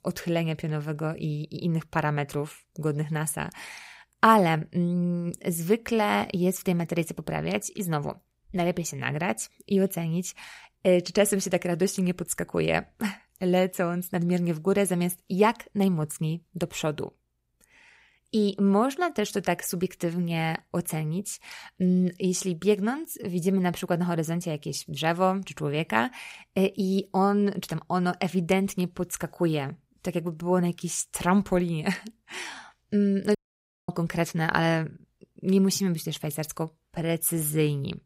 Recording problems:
audio cutting out; at 33 s for 0.5 s

